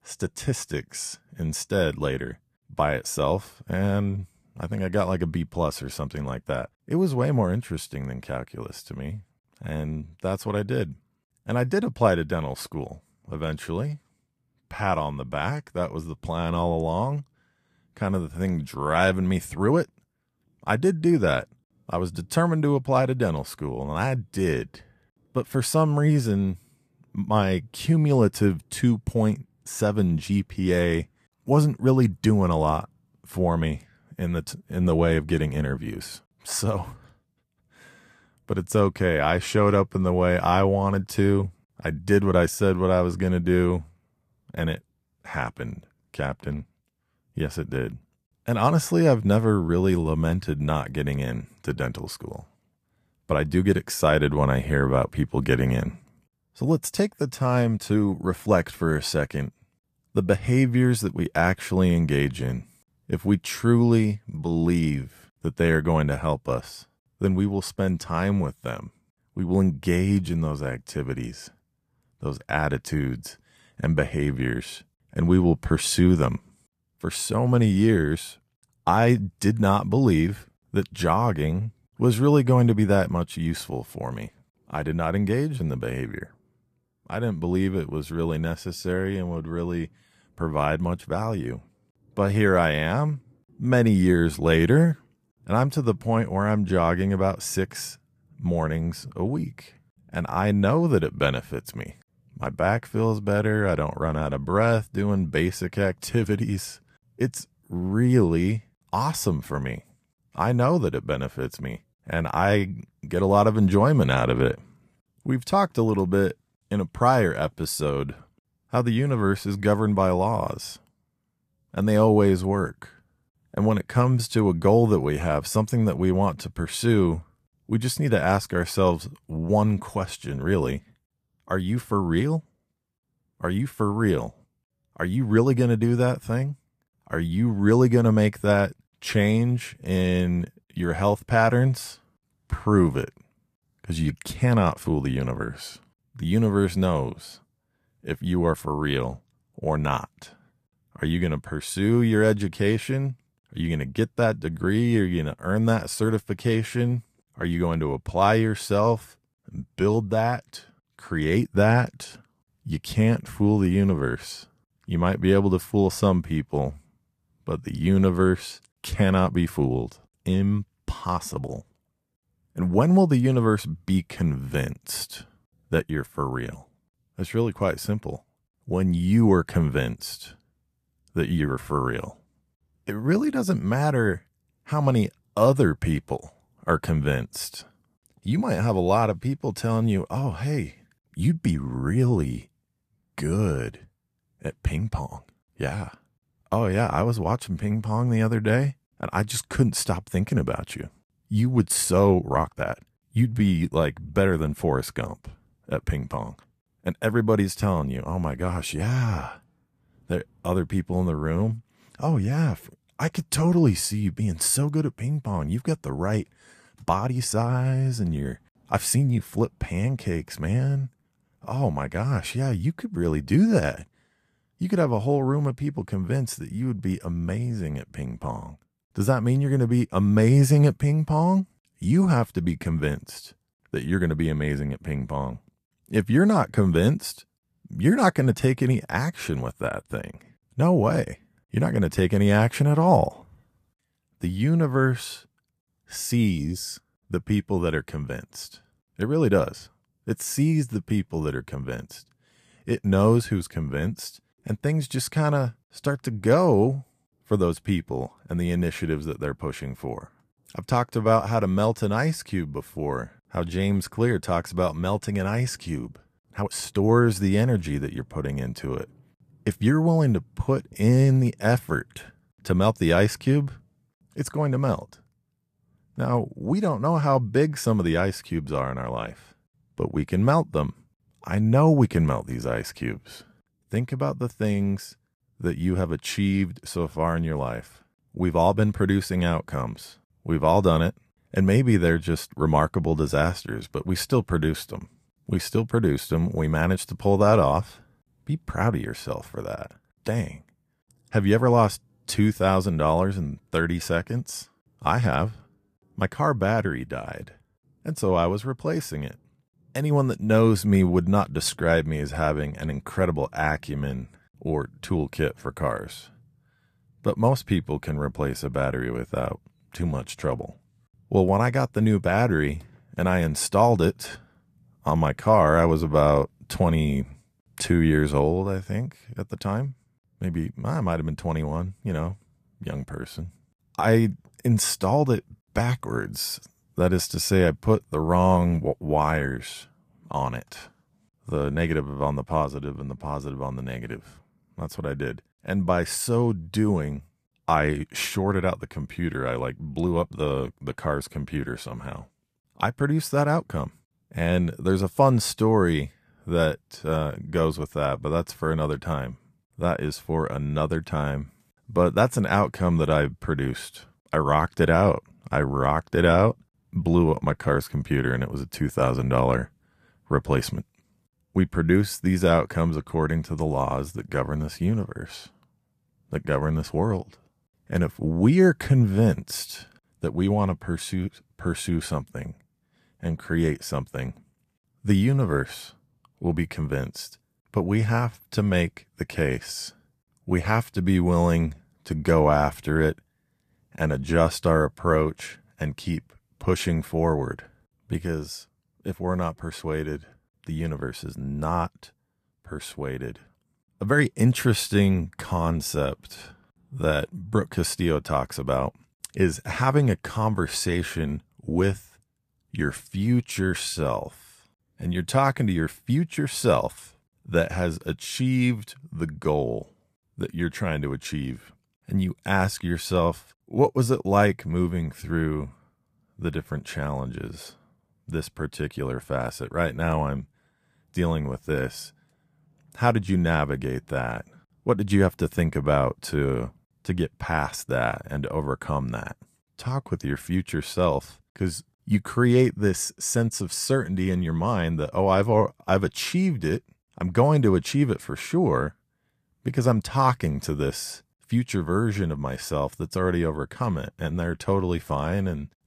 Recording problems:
uneven, jittery; strongly; from 57 s to 7:05

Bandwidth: 14.5 kHz